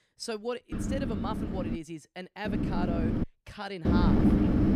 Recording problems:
wind noise on the microphone; heavy; from 0.5 to 2 s, at 2.5 s and at 4 s; 3 dB above the speech

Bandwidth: 15 kHz